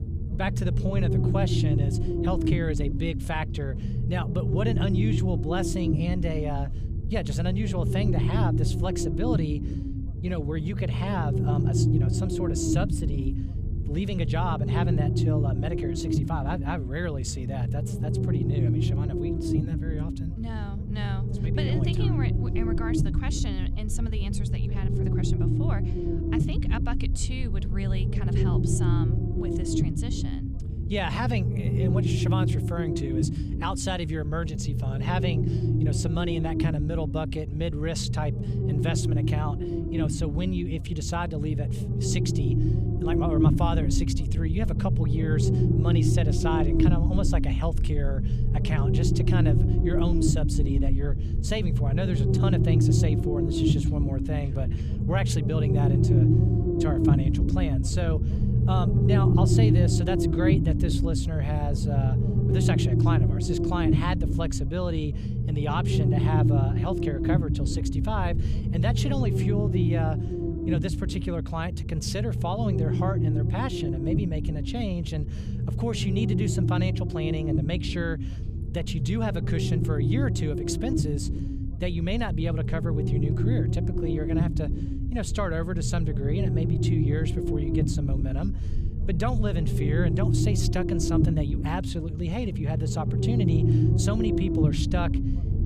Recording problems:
low rumble; loud; throughout; as loud as the speech

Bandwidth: 14.5 kHz